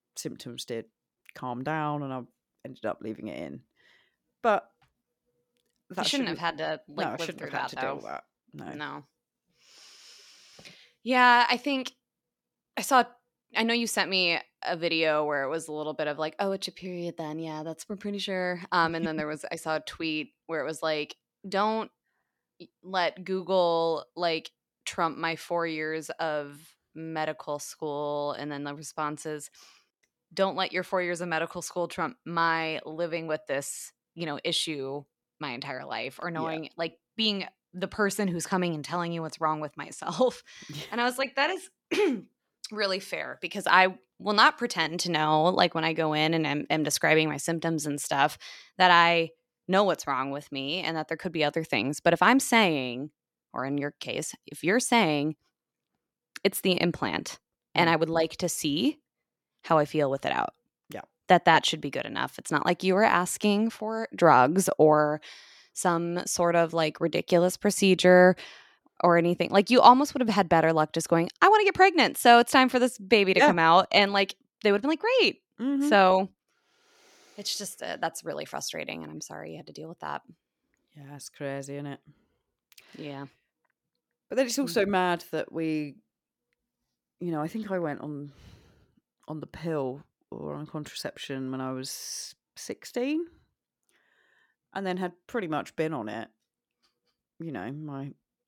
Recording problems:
none

